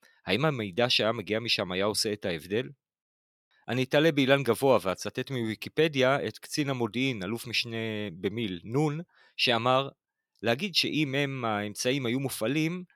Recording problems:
none

